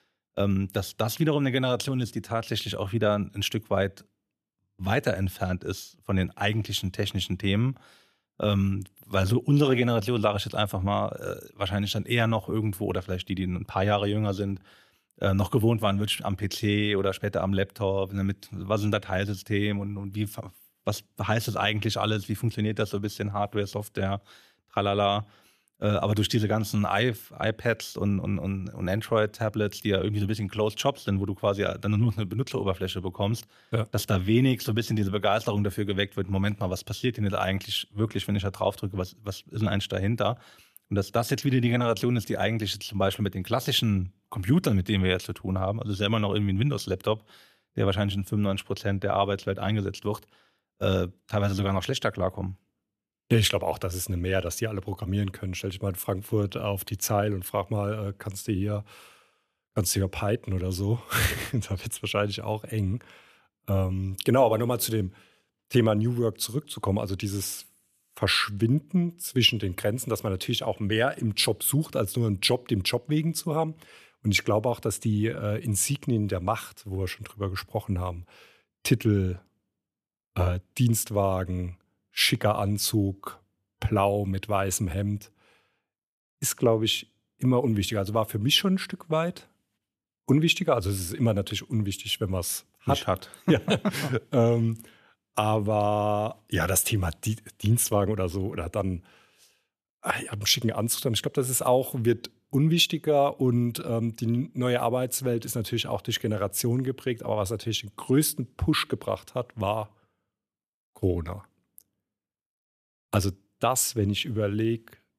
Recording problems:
none

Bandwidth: 14.5 kHz